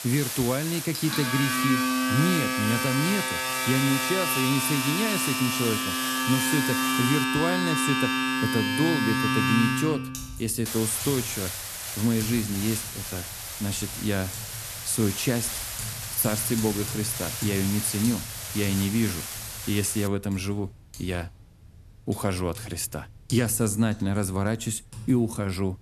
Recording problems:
household noises; loud; throughout; as loud as the speech
hiss; loud; until 7 s and from 11 to 20 s; 5 dB below the speech

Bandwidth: 13.5 kHz